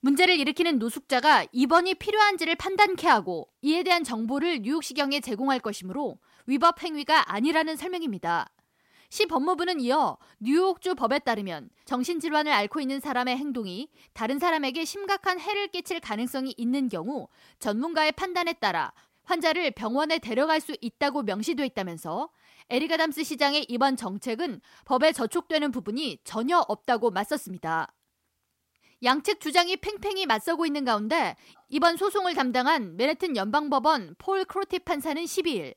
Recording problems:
none

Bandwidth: 16 kHz